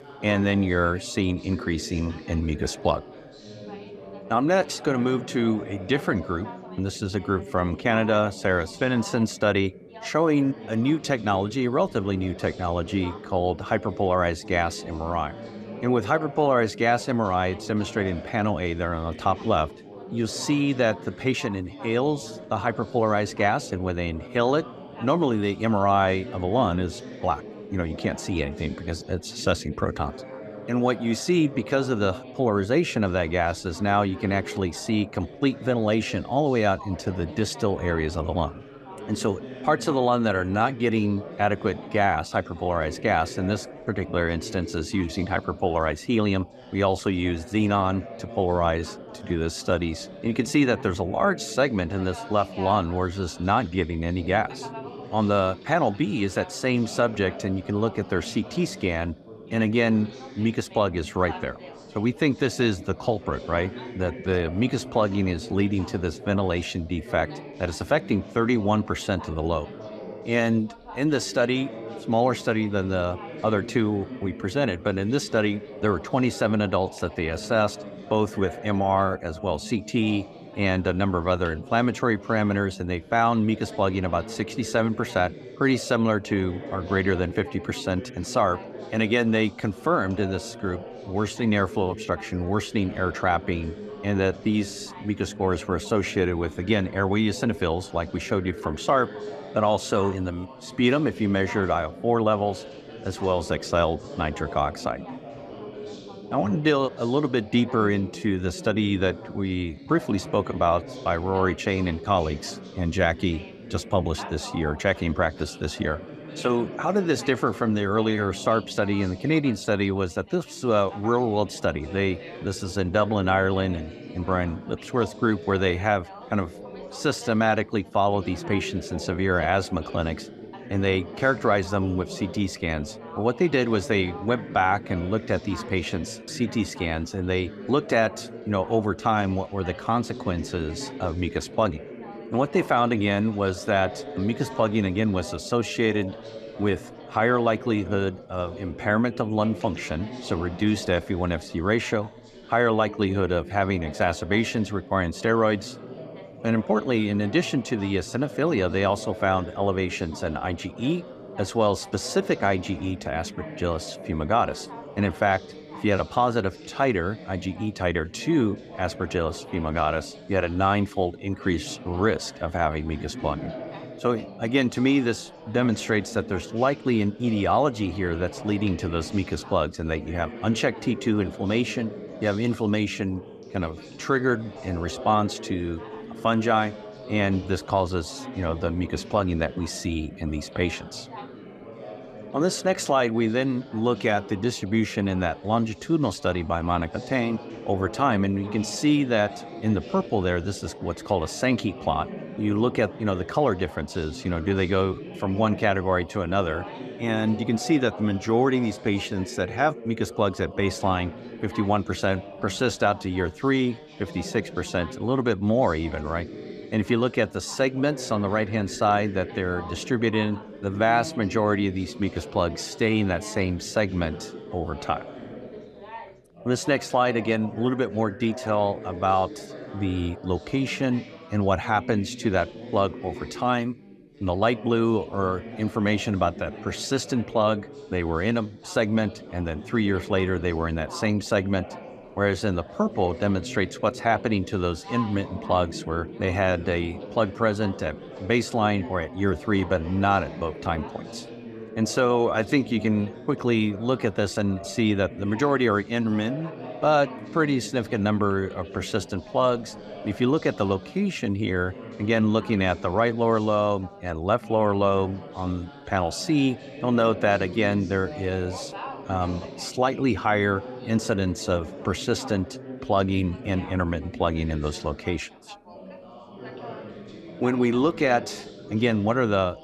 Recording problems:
background chatter; noticeable; throughout; 4 voices, 15 dB below the speech

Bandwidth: 14.5 kHz